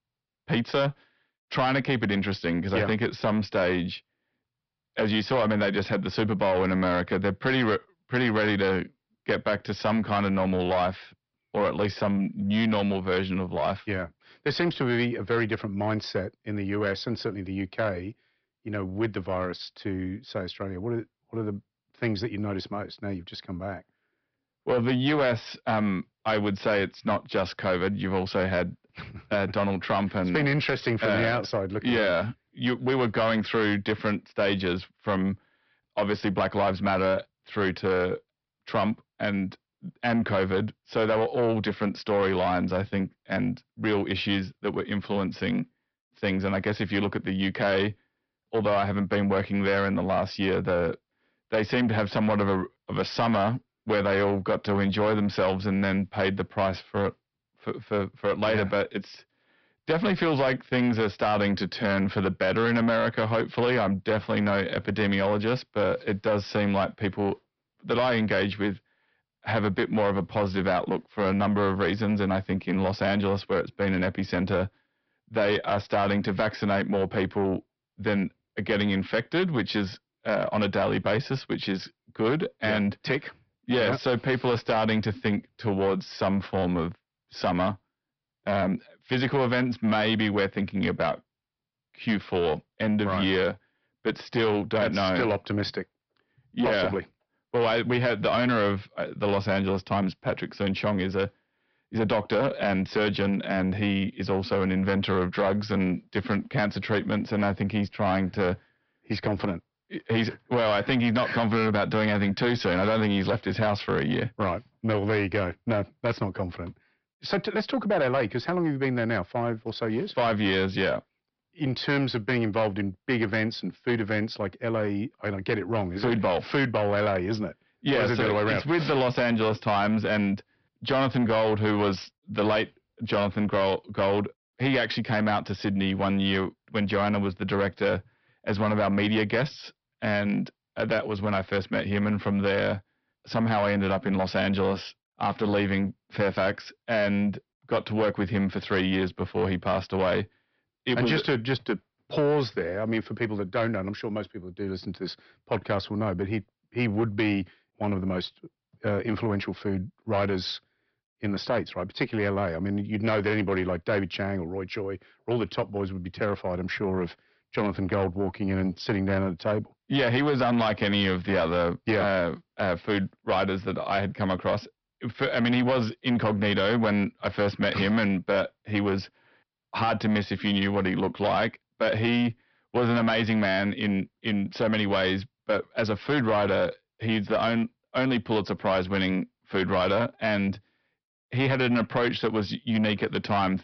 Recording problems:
high frequencies cut off; noticeable; nothing above 5.5 kHz
distortion; slight; 10 dB below the speech

